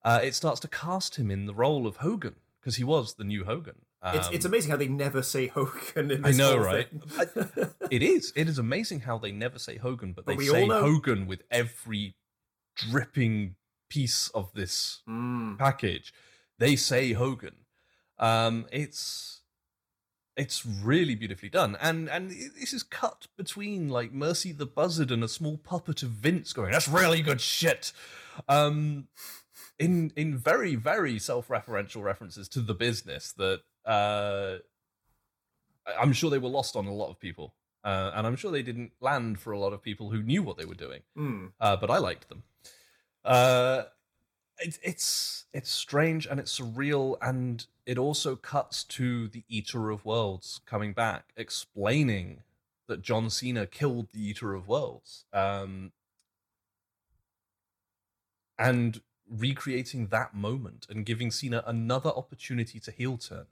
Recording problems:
none

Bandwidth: 18 kHz